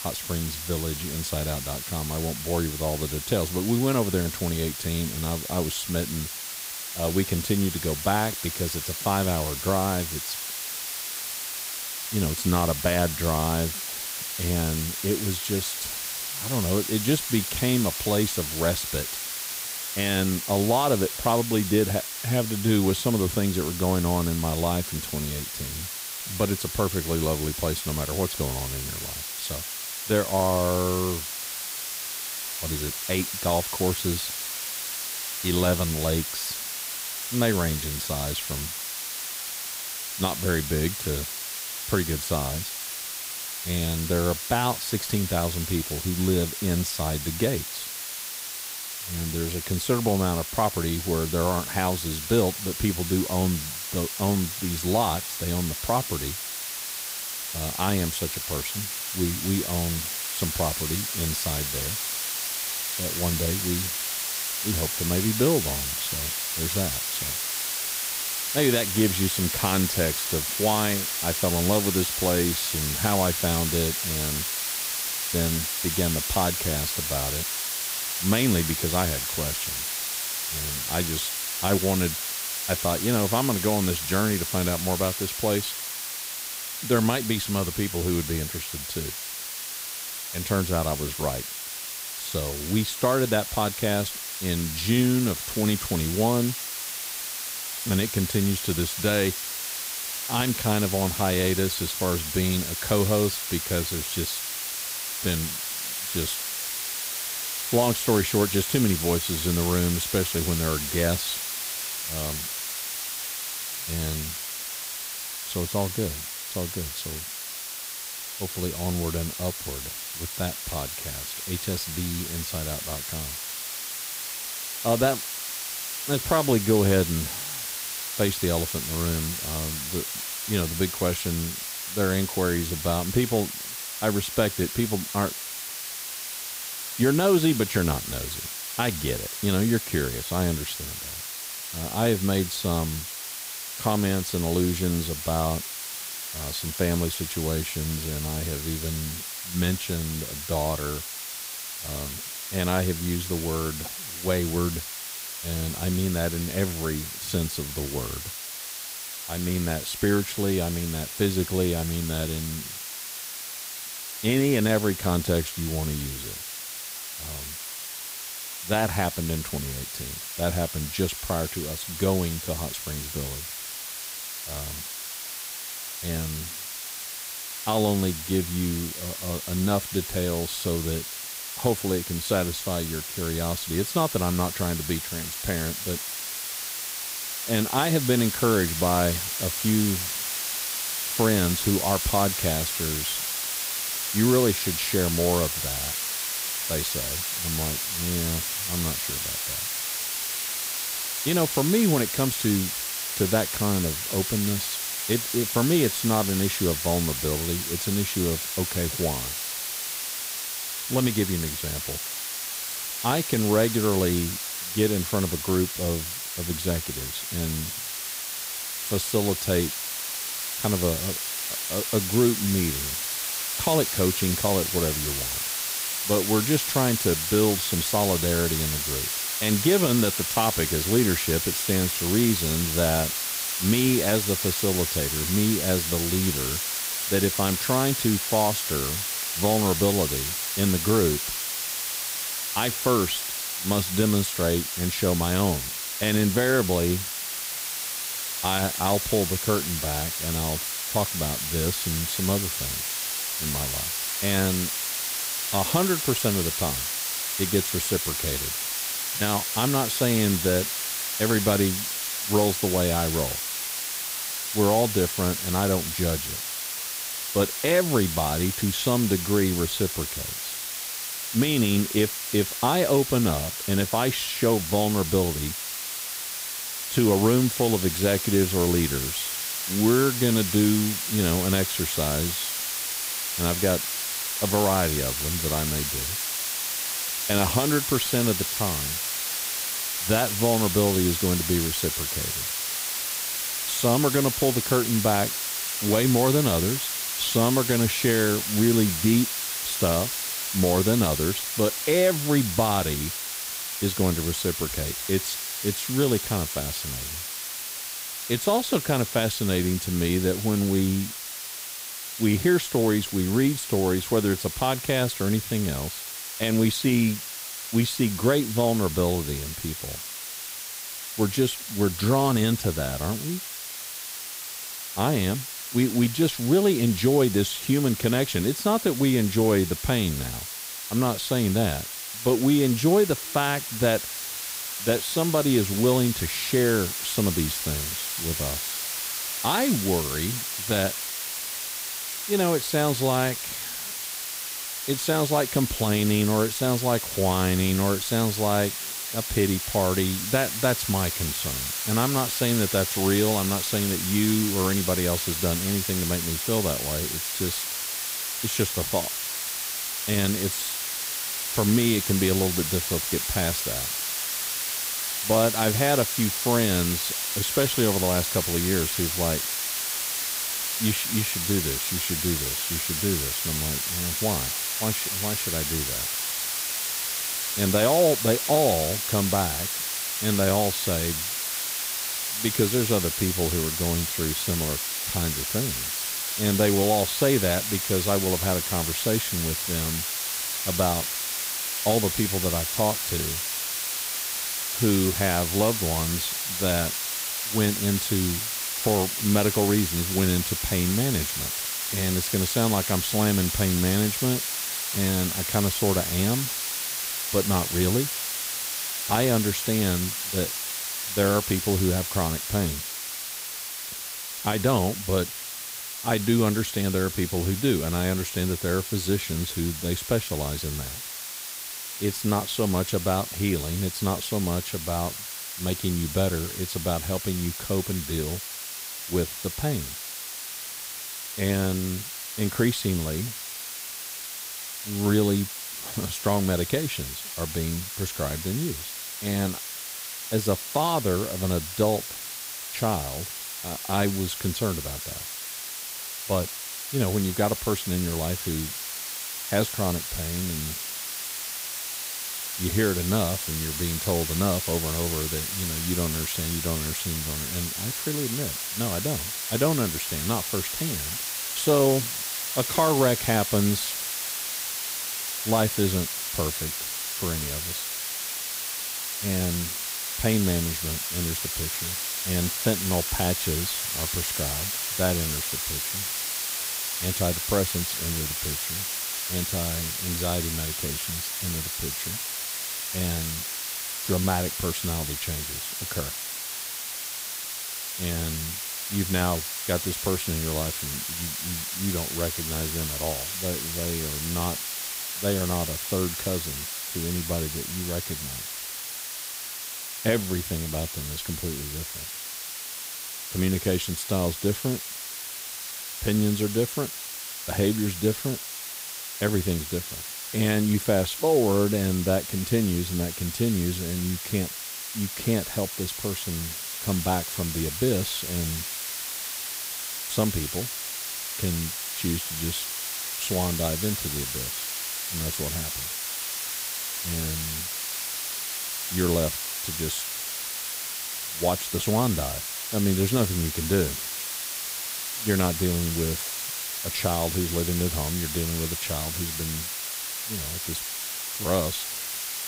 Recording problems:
hiss; loud; throughout; 2 dB below the speech

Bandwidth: 15.5 kHz